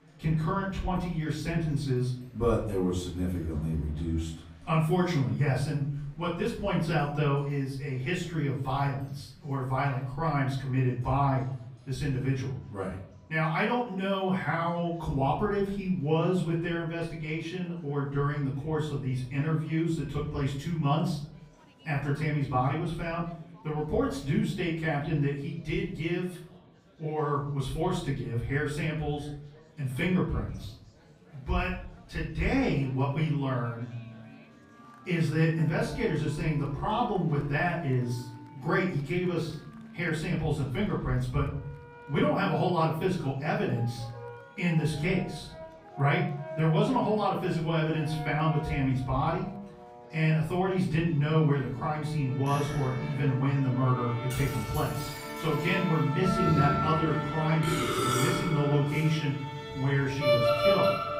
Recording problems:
off-mic speech; far
room echo; noticeable; dies away in 0.6 s
background music; loud; throughout; 5 dB below the speech
chatter from many people; faint; throughout; 25 dB below the speech

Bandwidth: 15.5 kHz